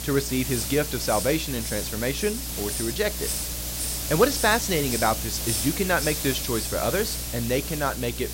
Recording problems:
hiss; loud; throughout; 3 dB below the speech
electrical hum; faint; throughout; 60 Hz, 25 dB below the speech

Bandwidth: 16 kHz